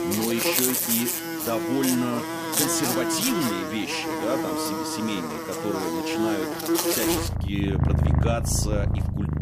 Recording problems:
animal sounds; very loud; throughout; 3 dB above the speech

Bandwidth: 15 kHz